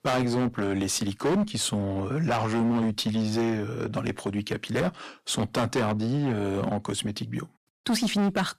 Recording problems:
distortion; heavy; 16% of the sound clipped

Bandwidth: 14.5 kHz